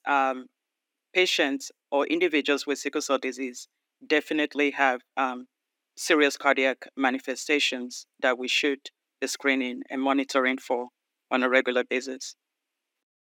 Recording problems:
thin; very slightly; fading below 250 Hz

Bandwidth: 18 kHz